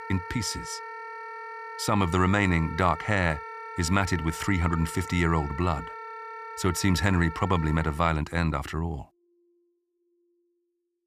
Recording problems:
background music; noticeable; throughout; 10 dB below the speech

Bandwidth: 15 kHz